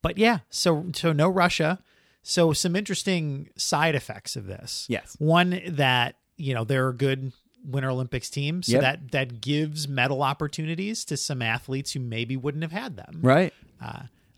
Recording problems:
none

